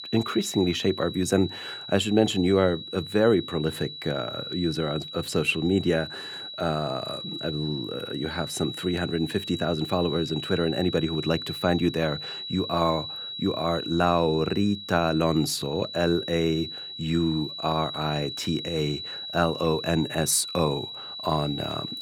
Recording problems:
high-pitched whine; loud; throughout; 4 kHz, 8 dB below the speech

